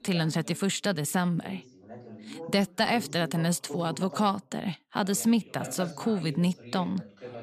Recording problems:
background chatter; noticeable; throughout; 2 voices, 15 dB below the speech

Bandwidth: 14.5 kHz